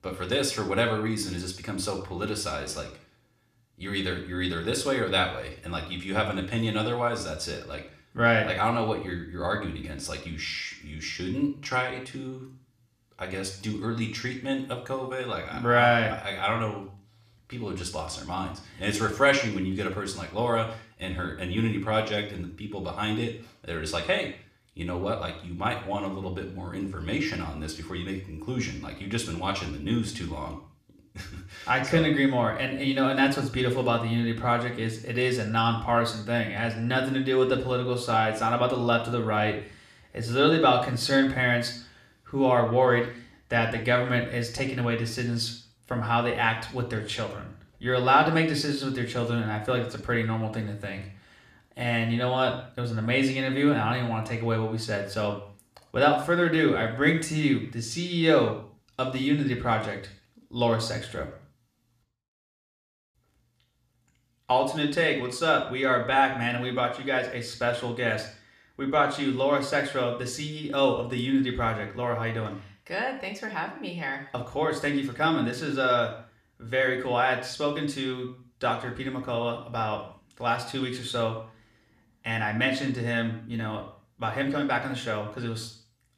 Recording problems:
room echo; slight; dies away in 0.5 s
off-mic speech; somewhat distant

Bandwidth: 14.5 kHz